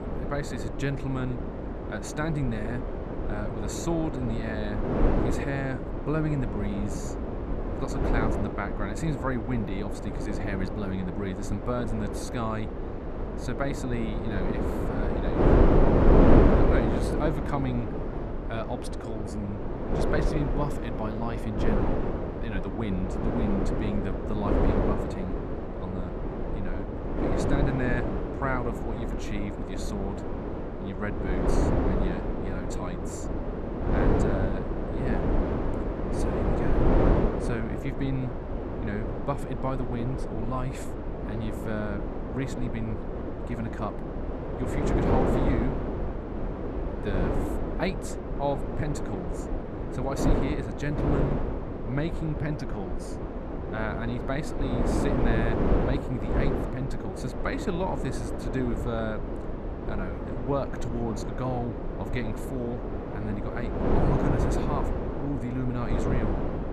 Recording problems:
wind noise on the microphone; heavy; 3 dB above the speech

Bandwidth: 13.5 kHz